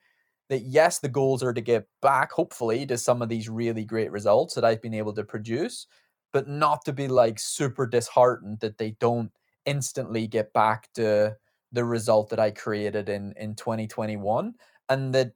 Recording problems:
uneven, jittery; strongly; from 1 to 12 s

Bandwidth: 19 kHz